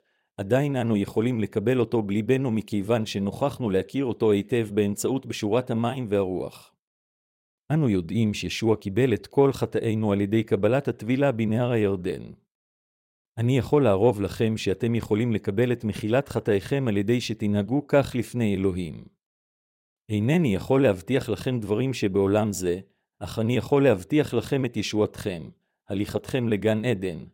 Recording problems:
none

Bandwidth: 16 kHz